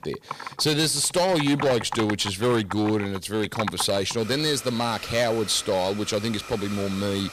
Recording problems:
distortion; slight; 6% of the sound clipped
household noises; noticeable; throughout; 10 dB below the speech

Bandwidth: 15 kHz